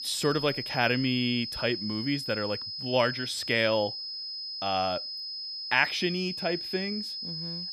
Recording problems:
high-pitched whine; loud; throughout; 5 kHz, 5 dB below the speech

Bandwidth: 14.5 kHz